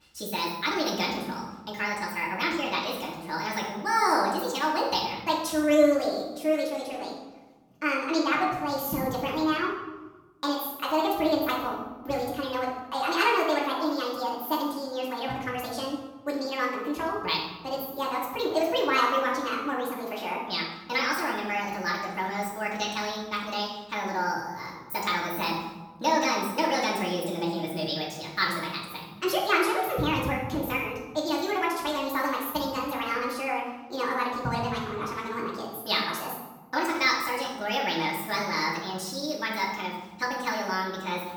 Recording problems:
off-mic speech; far
wrong speed and pitch; too fast and too high; 1.5 times normal speed
room echo; noticeable; dies away in 1.1 s

